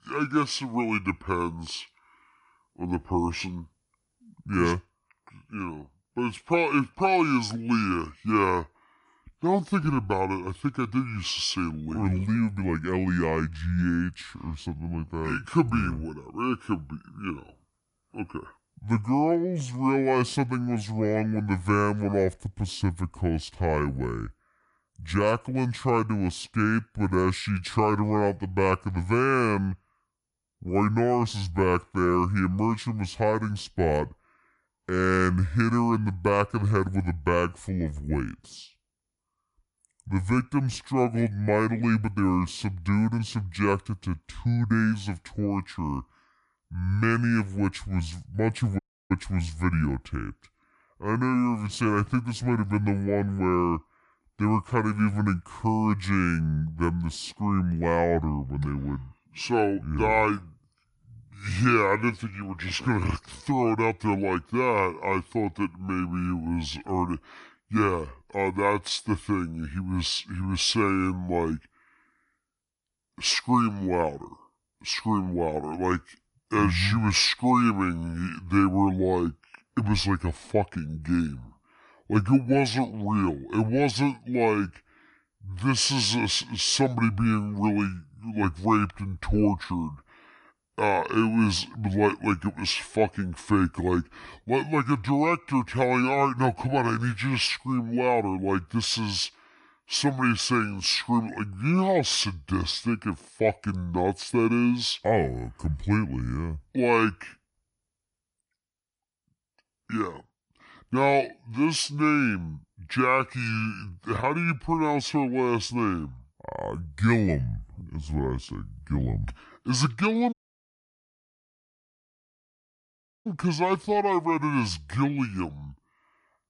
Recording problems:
wrong speed and pitch; too slow and too low; 0.7 times normal speed
audio cutting out; at 49 s and at 2:00 for 3 s

